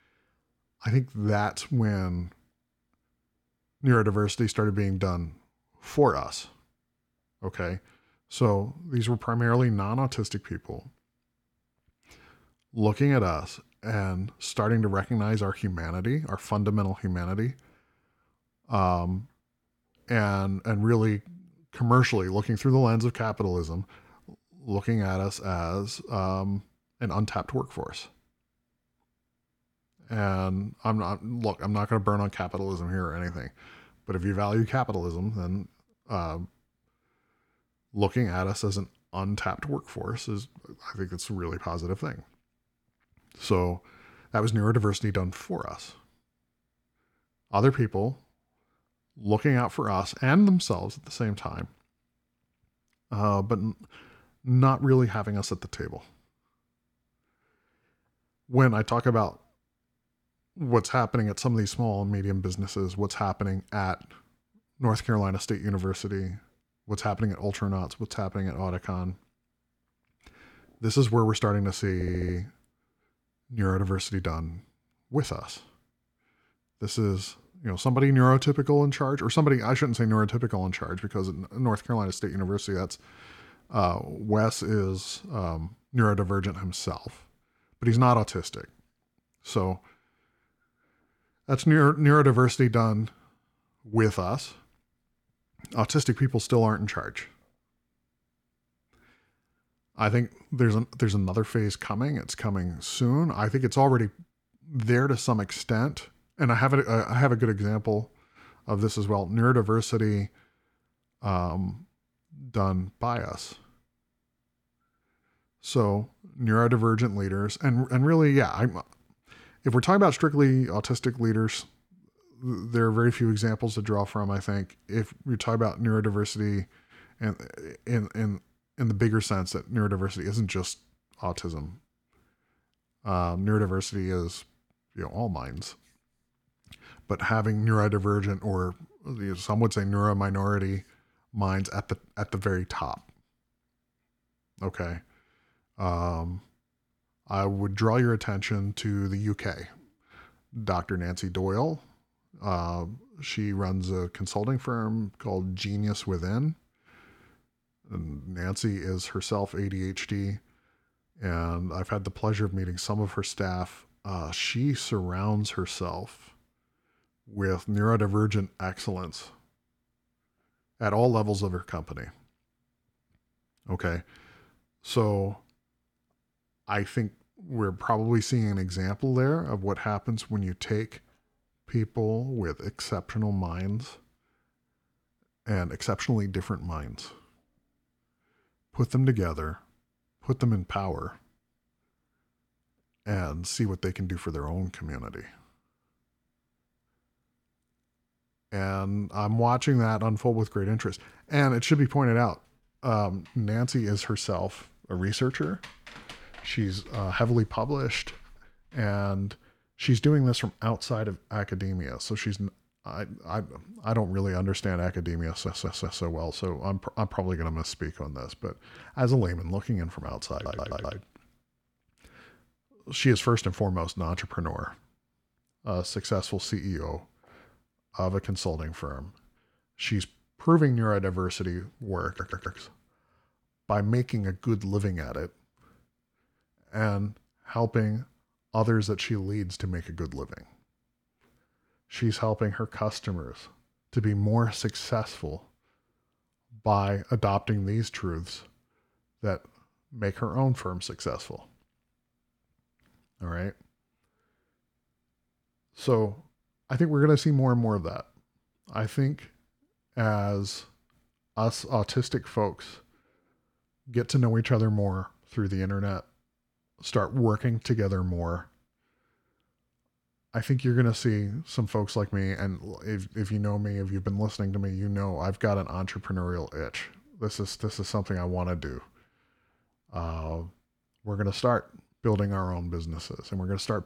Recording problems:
audio stuttering; 4 times, first at 1:12

